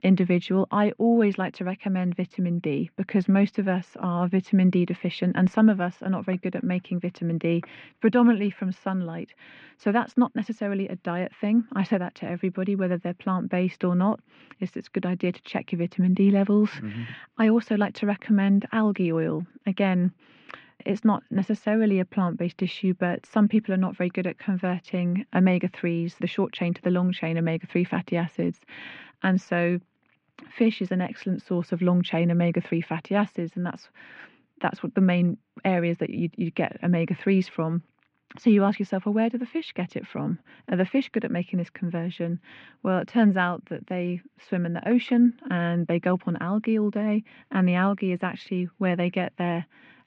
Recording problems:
muffled; very; fading above 2.5 kHz

